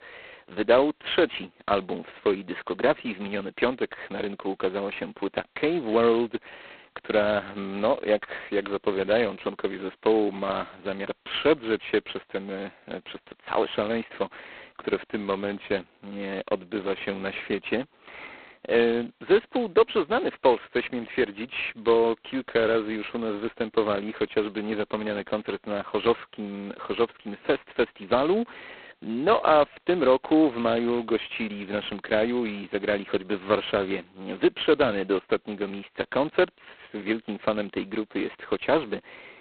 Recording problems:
phone-call audio; poor line; nothing above 4 kHz

